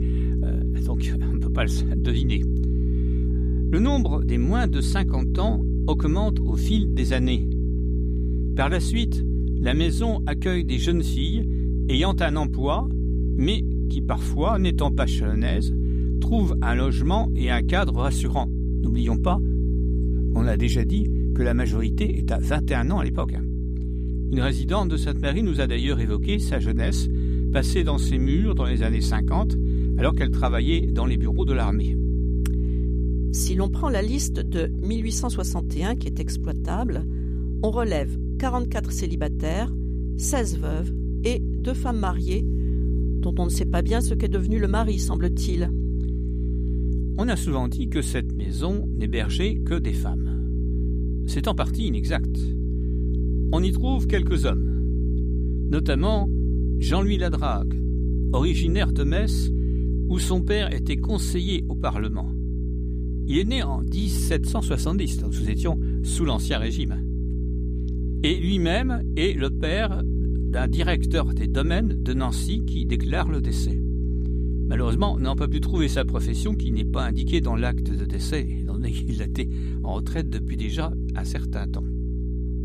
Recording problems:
electrical hum; loud; throughout; 60 Hz, 7 dB below the speech

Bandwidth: 15 kHz